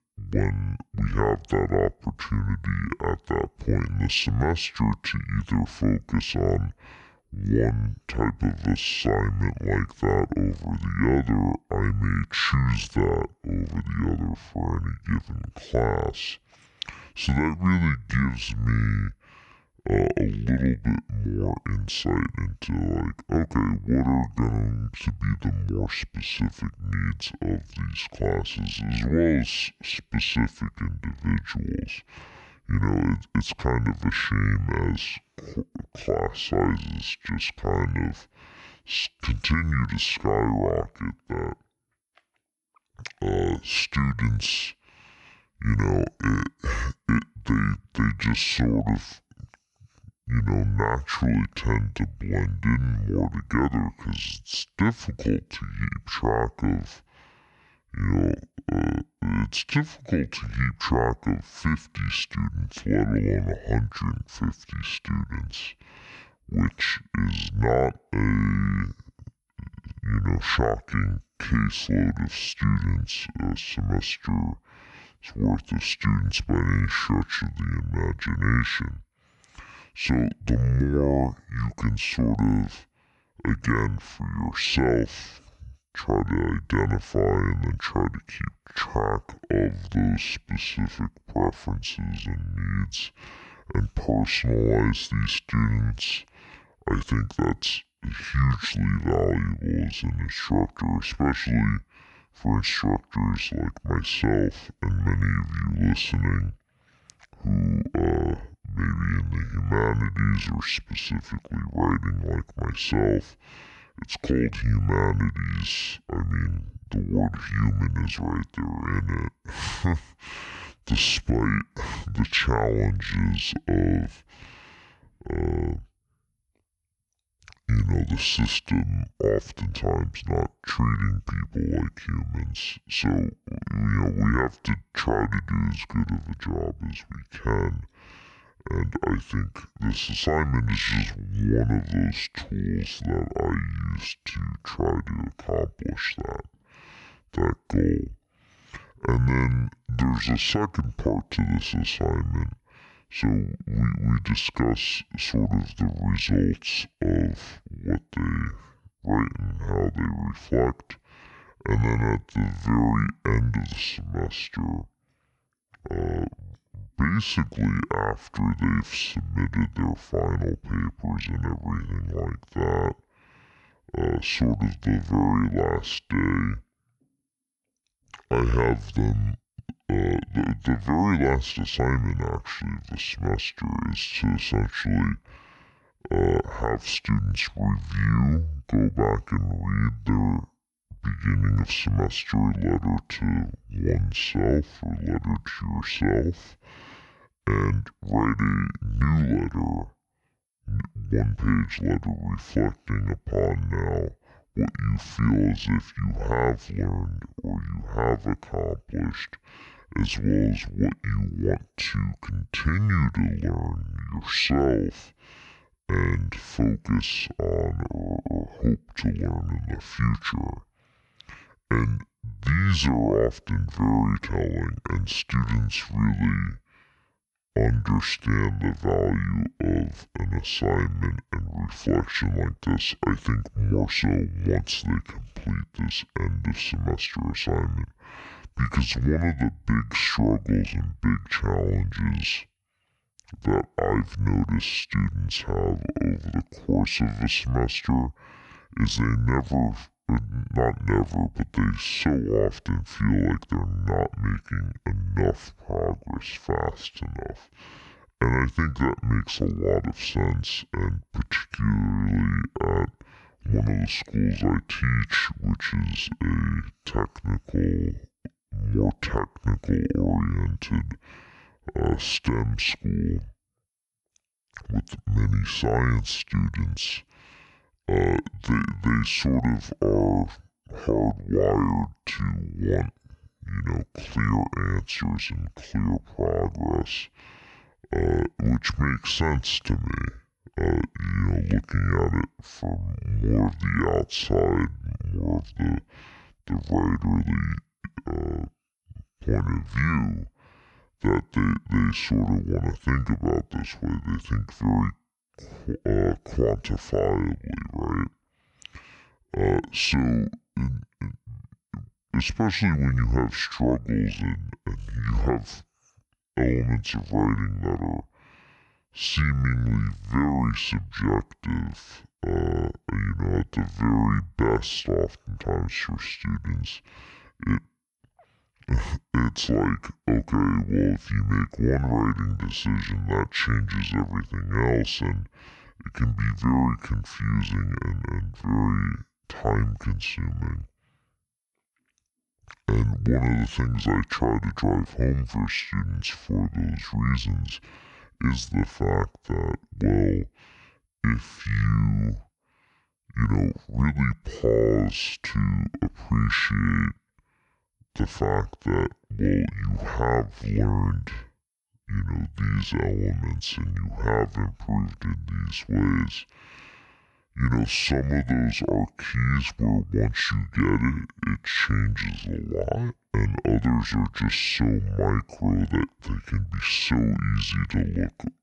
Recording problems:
wrong speed and pitch; too slow and too low; 0.6 times normal speed

